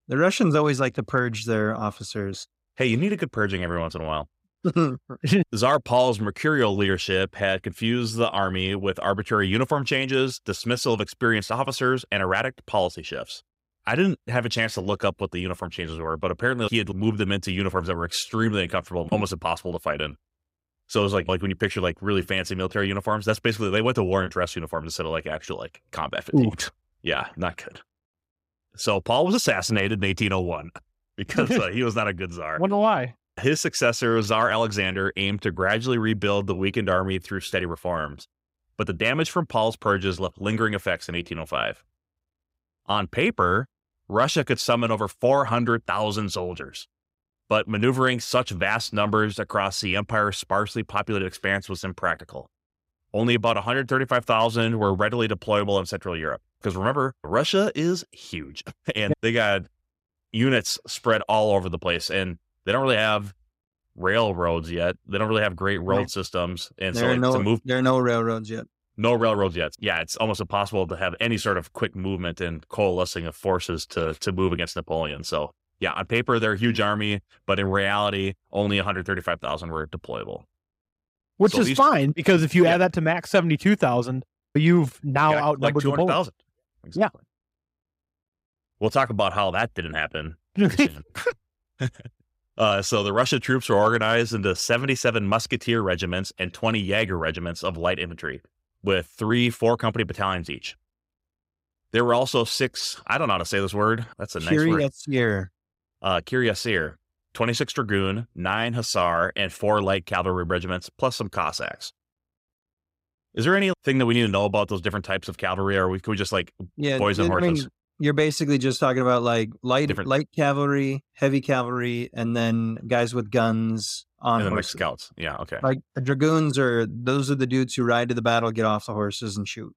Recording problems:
none

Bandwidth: 15.5 kHz